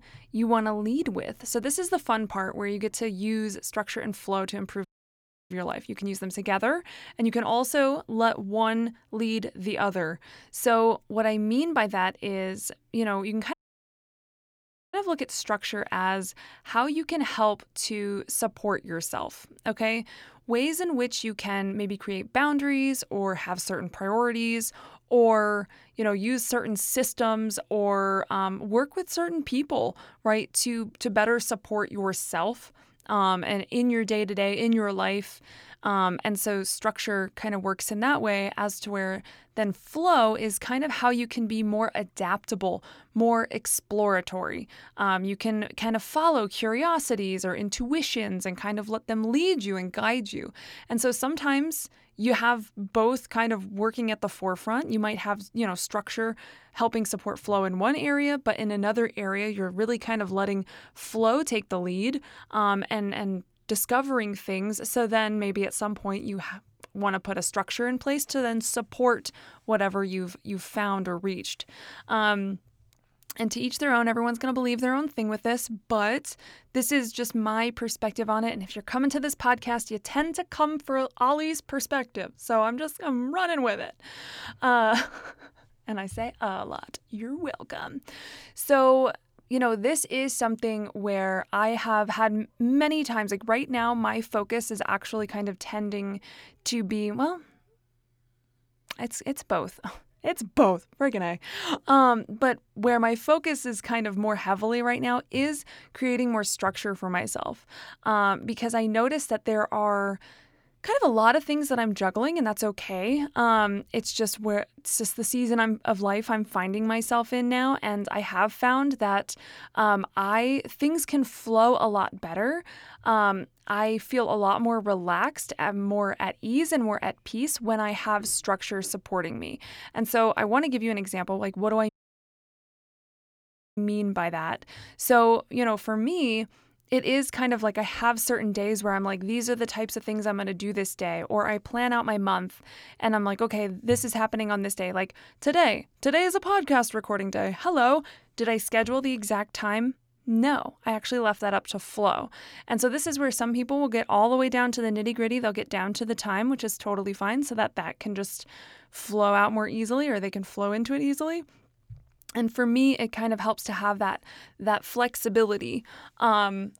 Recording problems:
audio cutting out; at 5 s for 0.5 s, at 14 s for 1.5 s and at 2:12 for 2 s

